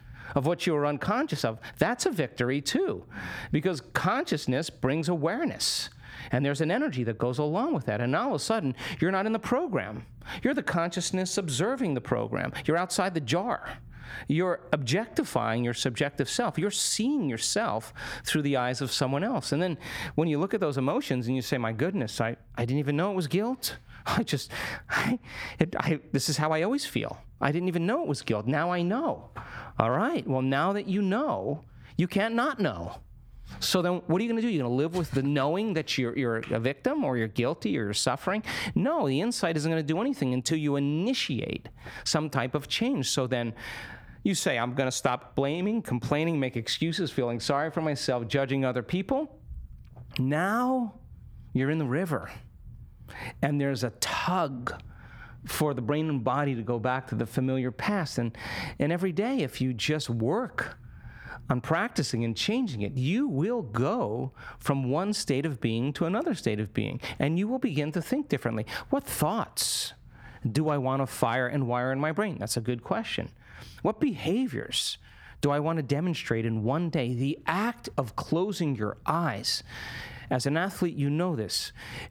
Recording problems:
squashed, flat; somewhat

